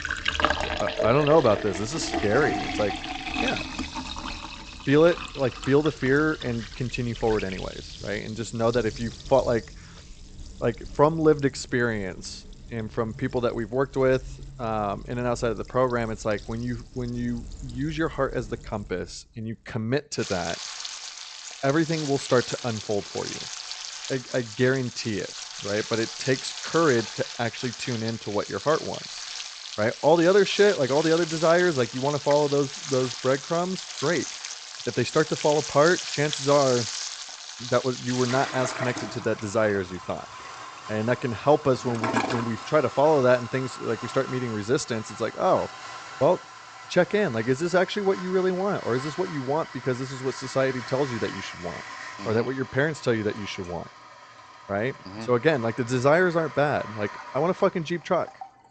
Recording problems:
high frequencies cut off; noticeable; nothing above 8 kHz
household noises; loud; throughout; 9 dB below the speech

